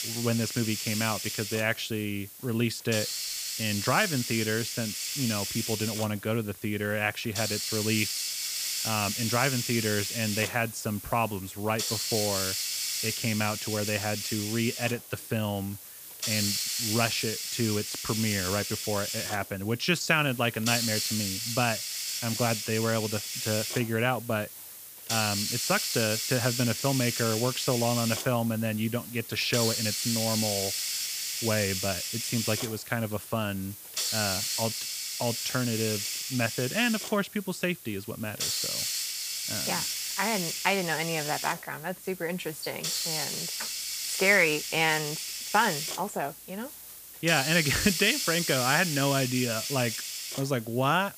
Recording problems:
hiss; loud; throughout; 1 dB below the speech

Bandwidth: 15 kHz